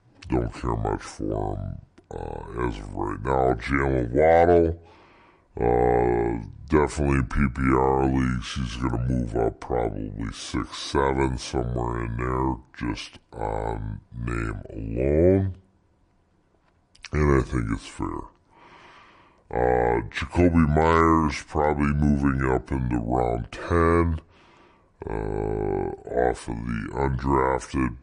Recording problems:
wrong speed and pitch; too slow and too low; 0.7 times normal speed

